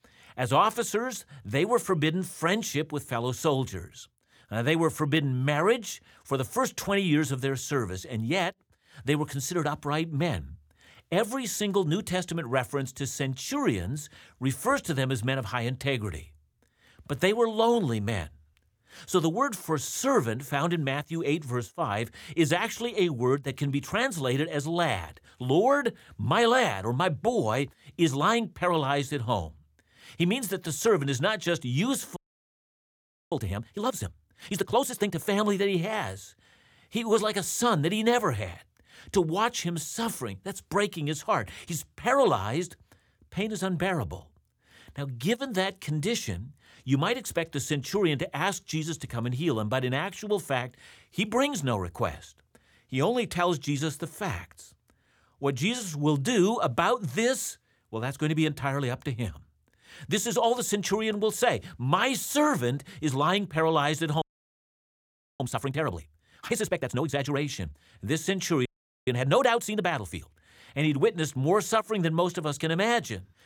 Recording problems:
audio freezing; at 32 s for 1 s, at 1:04 for 1 s and at 1:09

